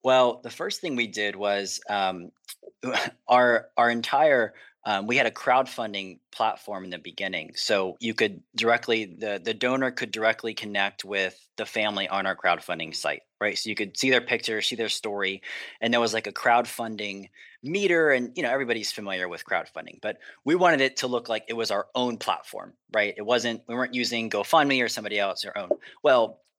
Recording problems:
thin; somewhat; fading below 450 Hz

